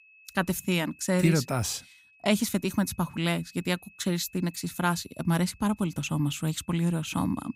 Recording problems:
high-pitched whine; faint; throughout; 2.5 kHz, 25 dB below the speech

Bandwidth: 15.5 kHz